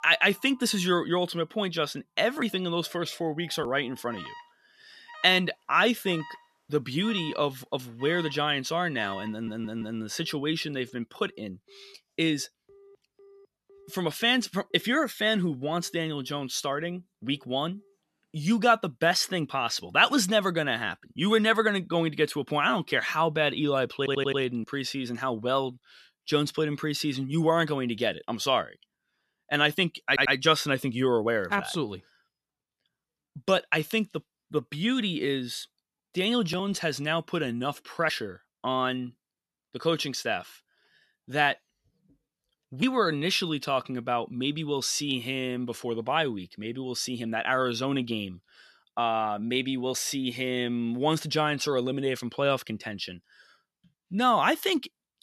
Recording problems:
alarms or sirens; faint; until 19 s; 20 dB below the speech
audio stuttering; at 9.5 s, at 24 s and at 30 s

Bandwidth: 13.5 kHz